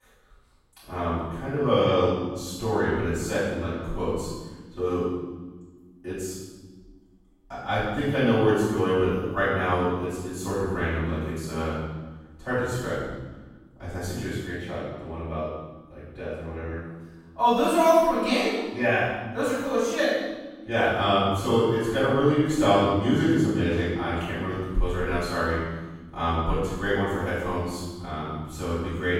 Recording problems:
room echo; strong; dies away in 1.2 s
off-mic speech; far

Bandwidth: 16 kHz